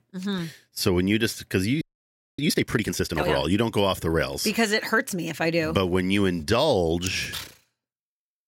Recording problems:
audio freezing; at 2 s for 0.5 s

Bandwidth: 16 kHz